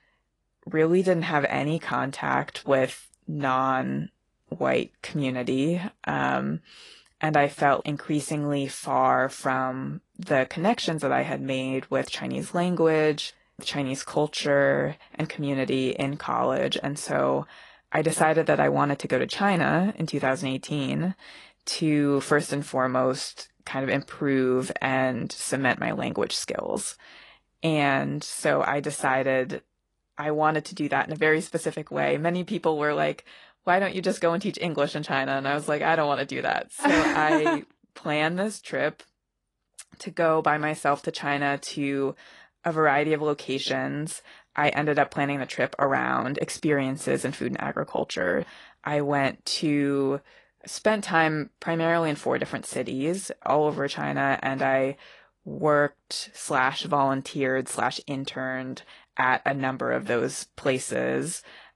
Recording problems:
garbled, watery; slightly; nothing above 10.5 kHz

